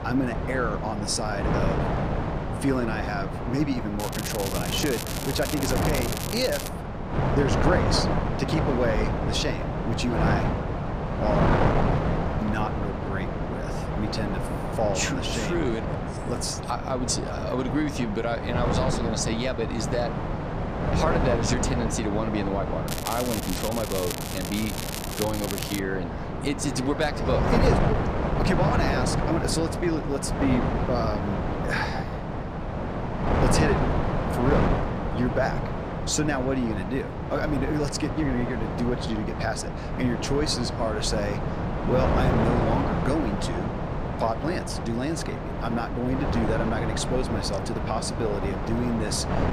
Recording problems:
wind noise on the microphone; heavy; 1 dB below the speech
crackling; loud; from 4 to 6.5 s and from 23 to 26 s; 5 dB below the speech

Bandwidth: 14.5 kHz